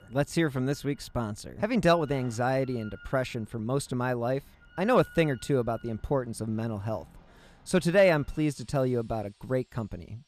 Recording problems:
machinery noise; faint; throughout; 25 dB below the speech

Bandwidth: 14.5 kHz